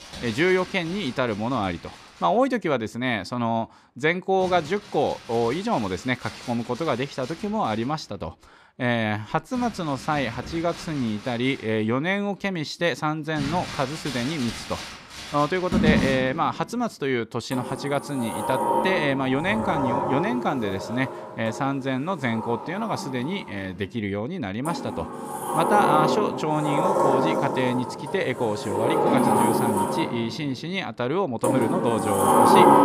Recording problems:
household noises; very loud; throughout; as loud as the speech

